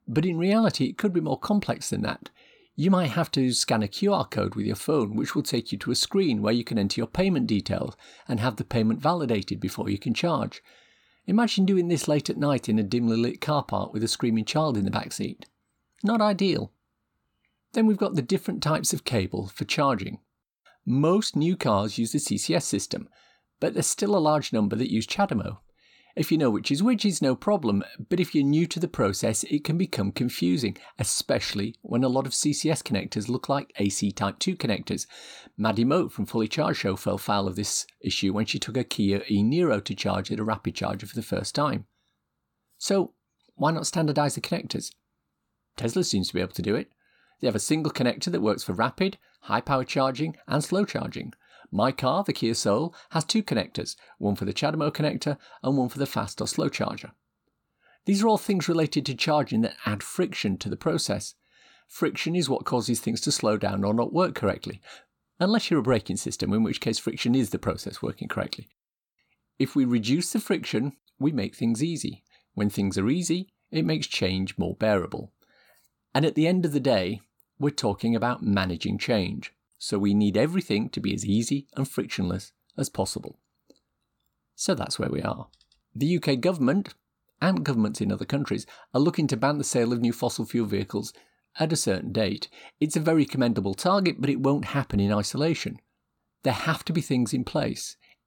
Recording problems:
none

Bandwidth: 18 kHz